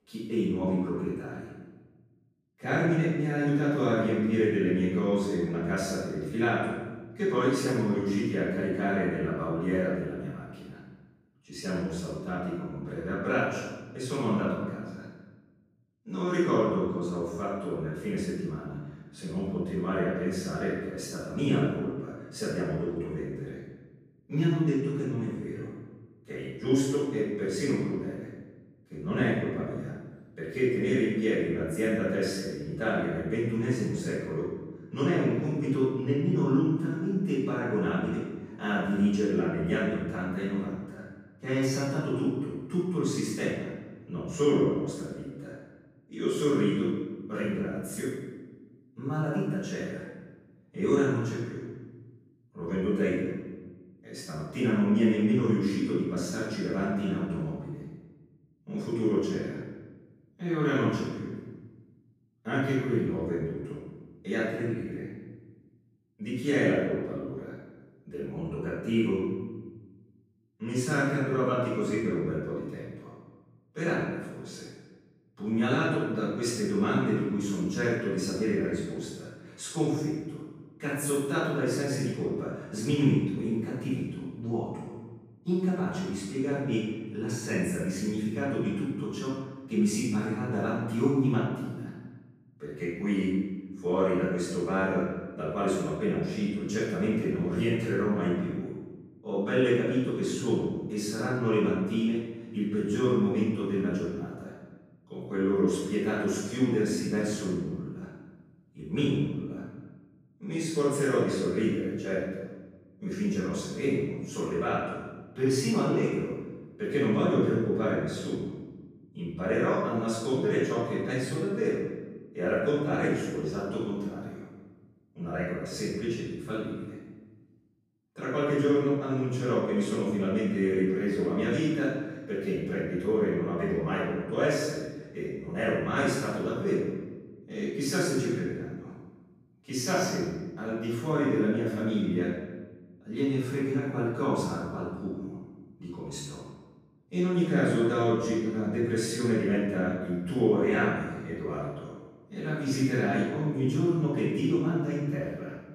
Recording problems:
room echo; strong; dies away in 1.1 s
off-mic speech; far

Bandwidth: 15 kHz